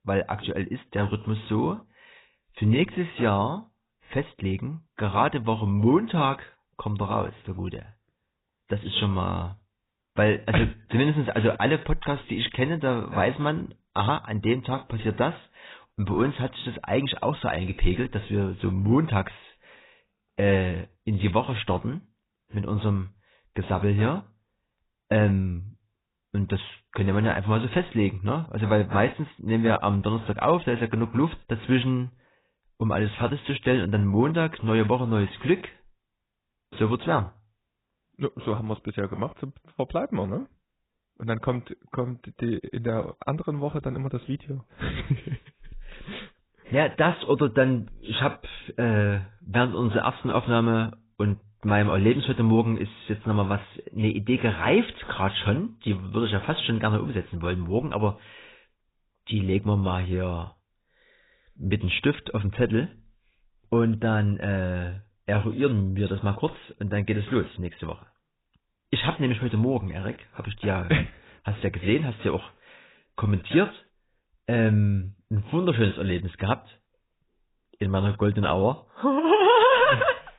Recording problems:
garbled, watery; badly; nothing above 4 kHz

